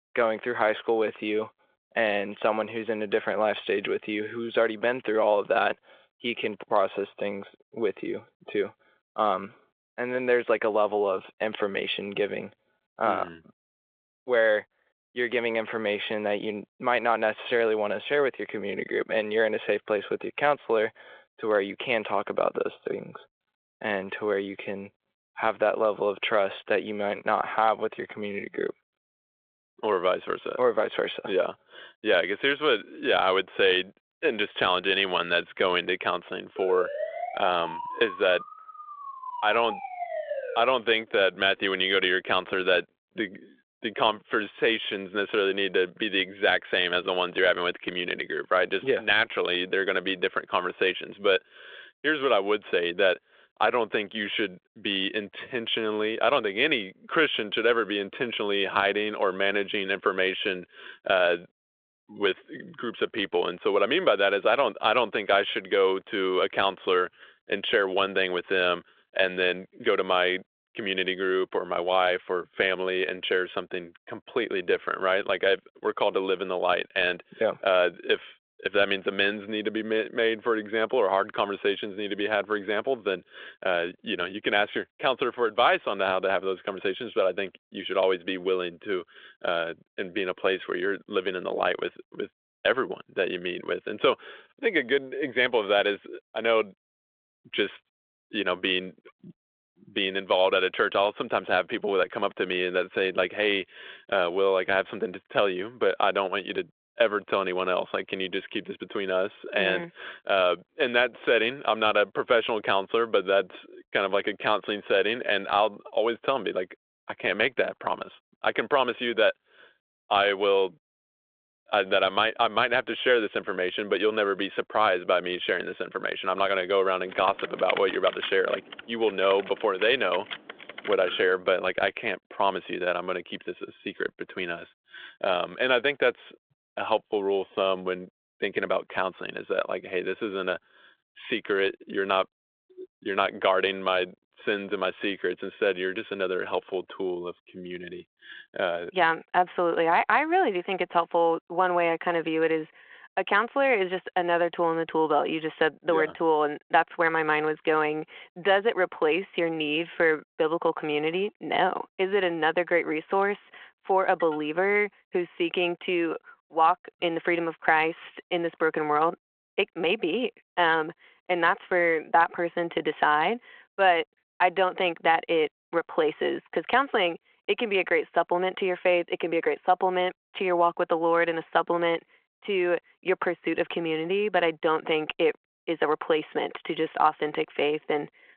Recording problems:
phone-call audio; nothing above 3.5 kHz
siren; noticeable; from 37 to 41 s; peak 6 dB below the speech
keyboard typing; noticeable; from 2:07 to 2:11; peak 5 dB below the speech

